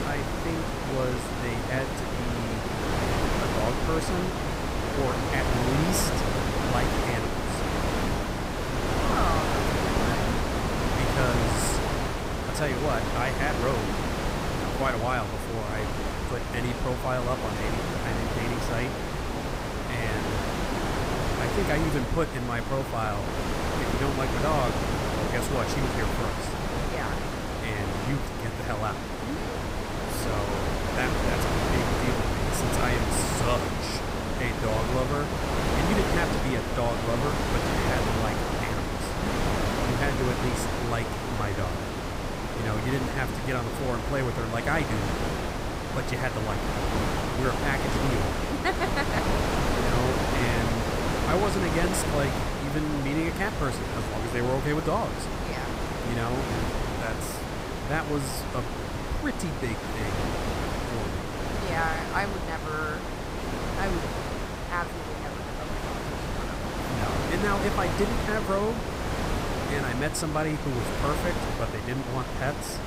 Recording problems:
wind noise on the microphone; heavy; 2 dB above the speech

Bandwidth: 15.5 kHz